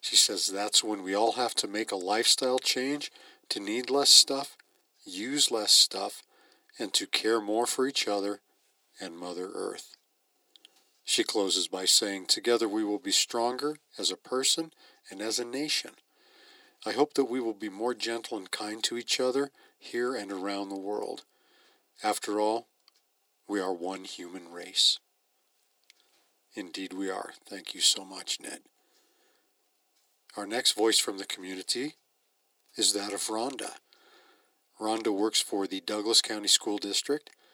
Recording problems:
thin; very; fading below 300 Hz

